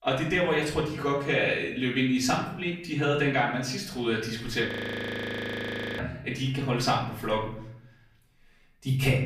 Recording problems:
off-mic speech; far
room echo; slight; dies away in 0.7 s
audio freezing; at 4.5 s for 1.5 s

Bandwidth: 15 kHz